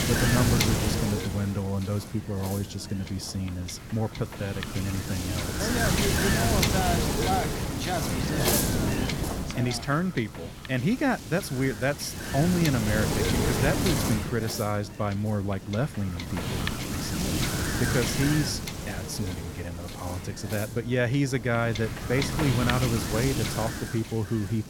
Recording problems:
wind noise on the microphone; heavy; 1 dB above the speech

